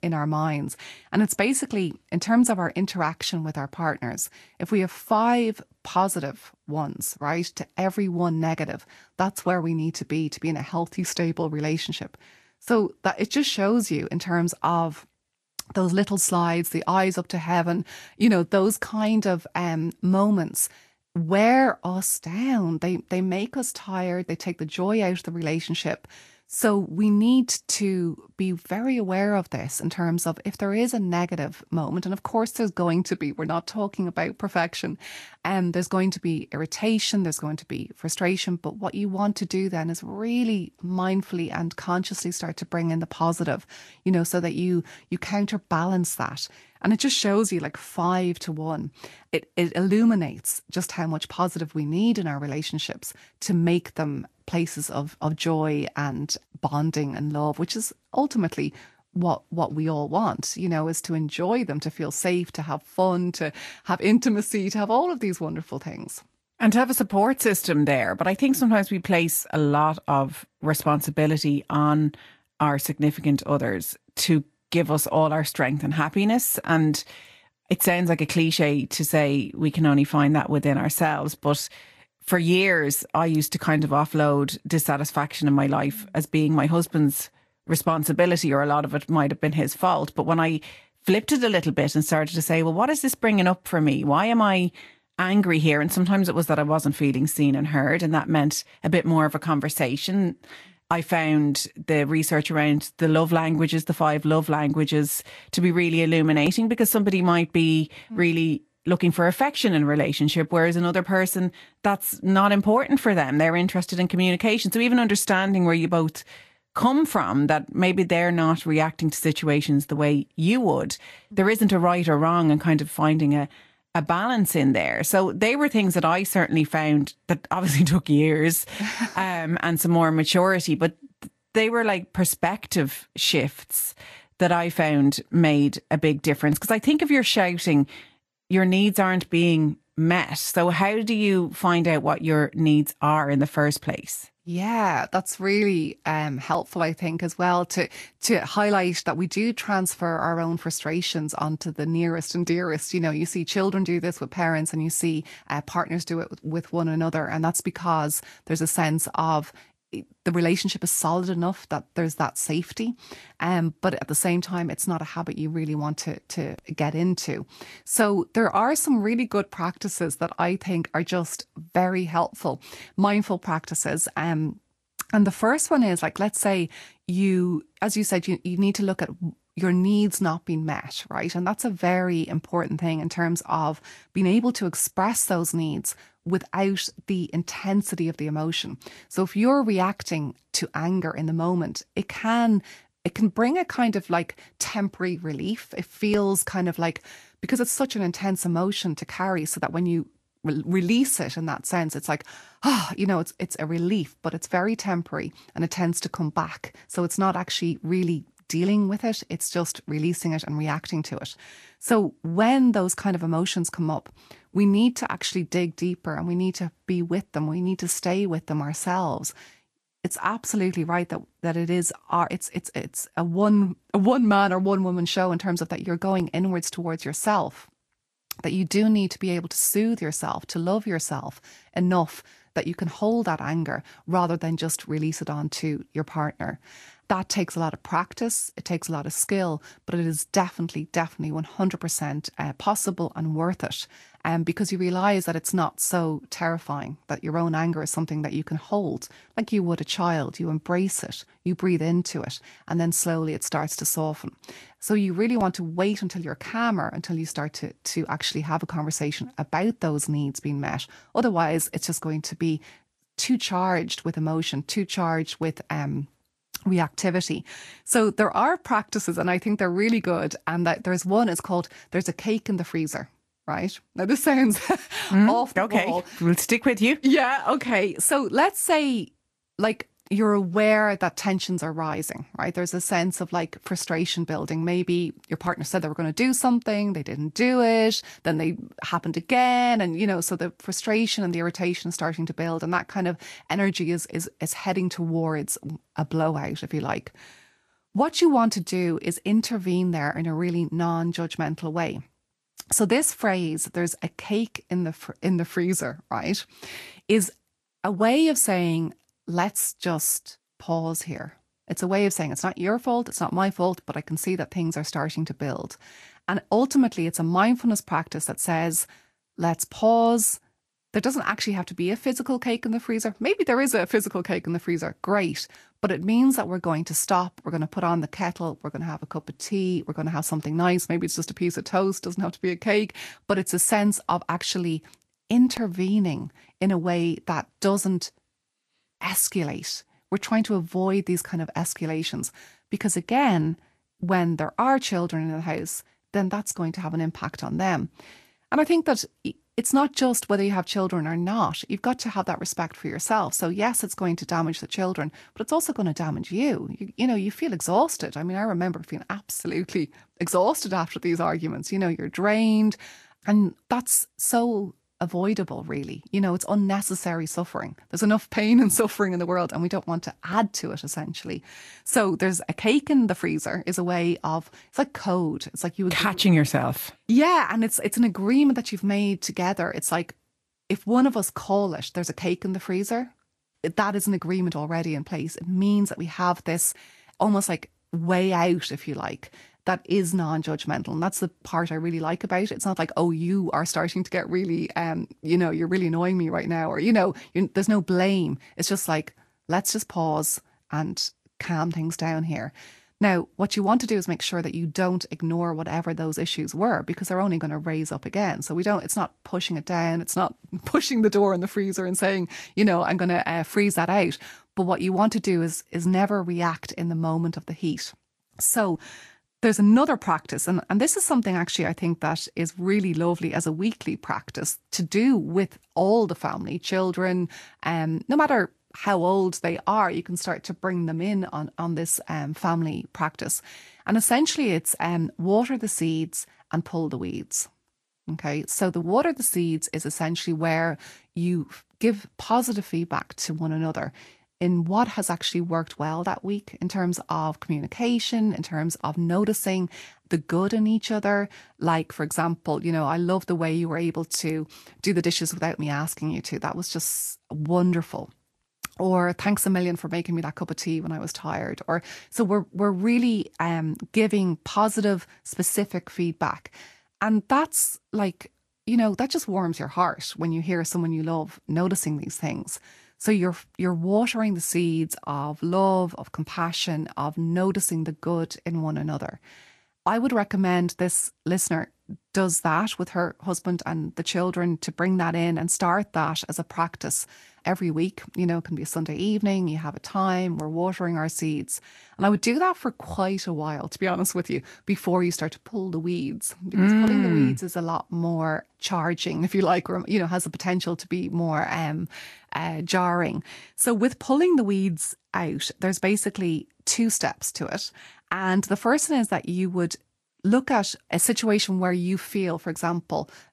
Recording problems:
garbled, watery; slightly; nothing above 12.5 kHz

